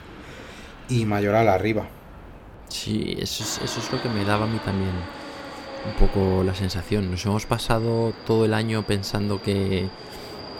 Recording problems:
train or aircraft noise; noticeable; throughout; 15 dB below the speech

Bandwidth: 17 kHz